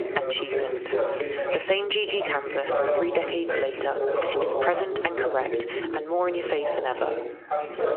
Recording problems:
squashed, flat; heavily, background pumping
phone-call audio; nothing above 3 kHz
background chatter; loud; throughout; 2 voices, 1 dB below the speech

